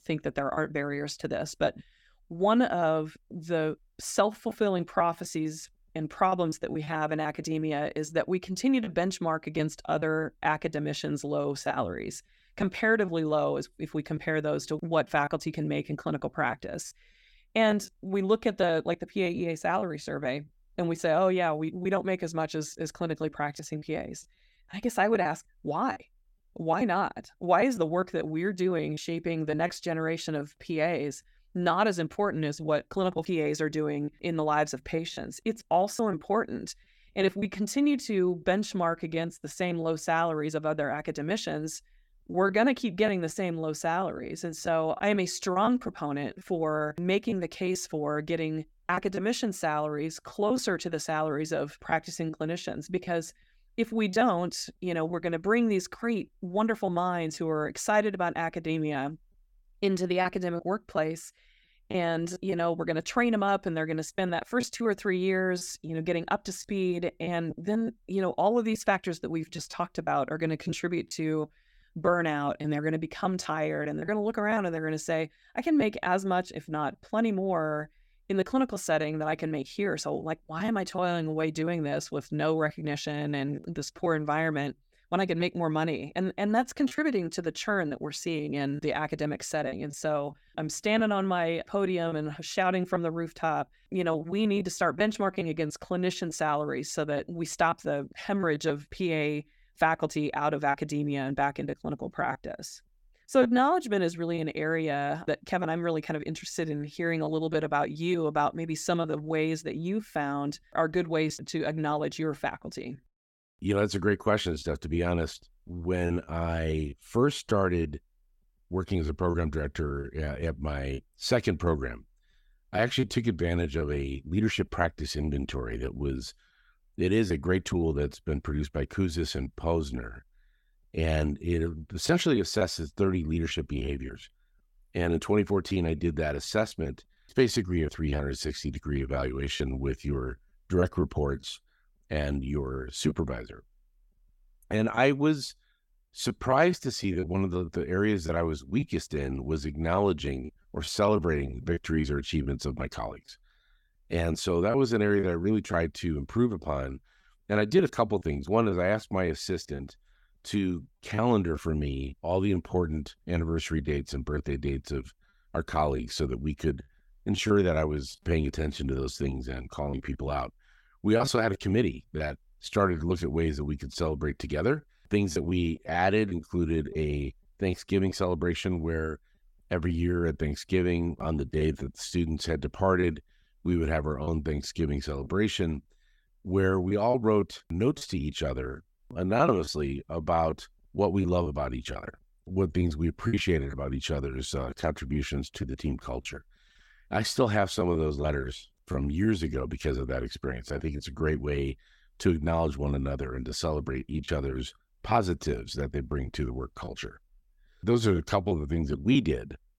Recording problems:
choppy; very; 5% of the speech affected

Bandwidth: 17 kHz